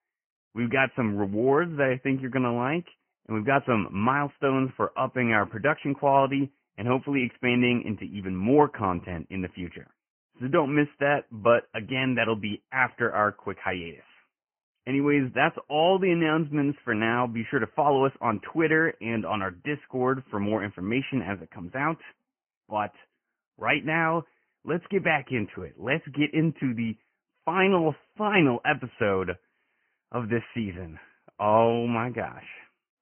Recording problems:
high frequencies cut off; severe; nothing above 3 kHz
garbled, watery; slightly

